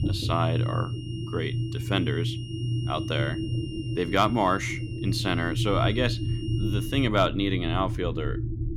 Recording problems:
high-pitched whine; noticeable; until 7 s; 3 kHz, 15 dB below the speech
low rumble; noticeable; throughout; 10 dB below the speech

